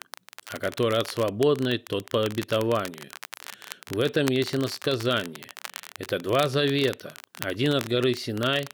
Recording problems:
crackle, like an old record; noticeable; 15 dB below the speech

